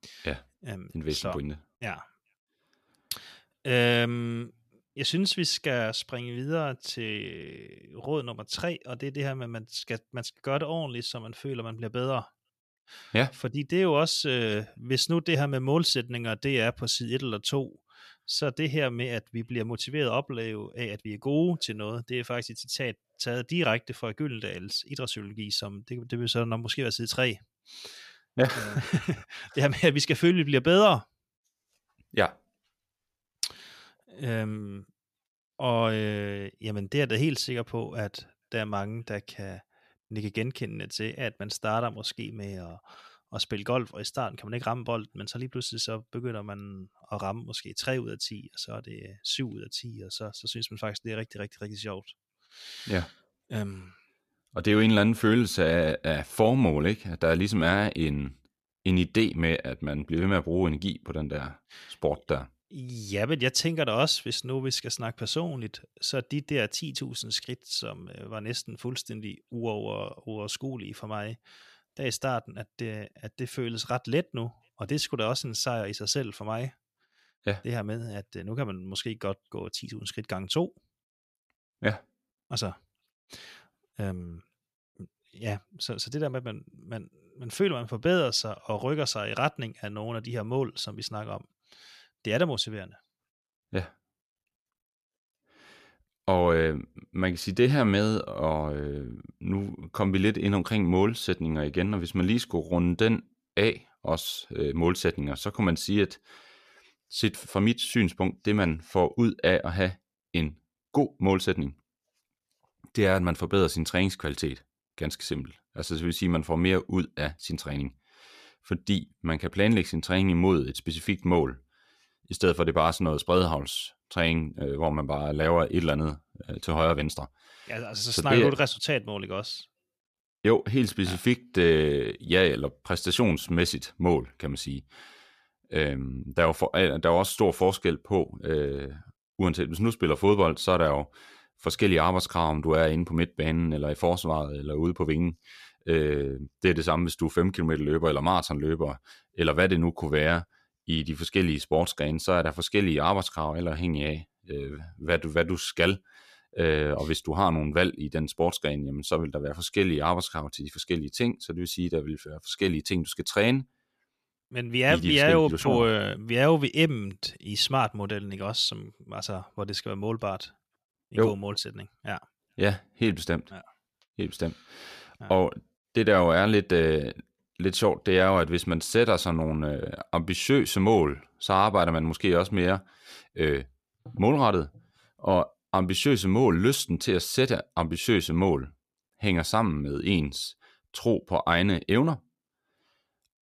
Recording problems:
none

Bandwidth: 14.5 kHz